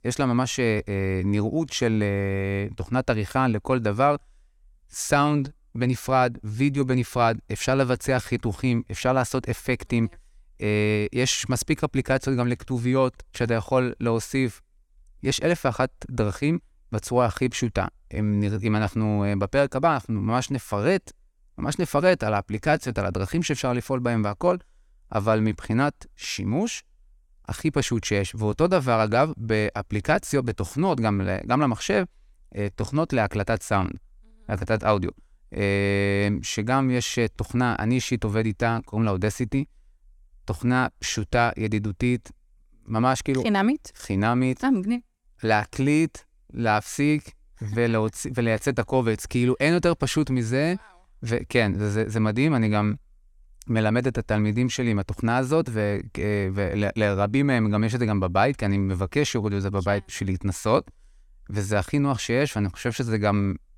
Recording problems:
none

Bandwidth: 17.5 kHz